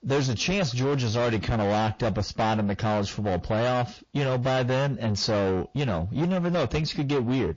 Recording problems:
distortion; heavy; 7 dB below the speech
garbled, watery; slightly; nothing above 6.5 kHz

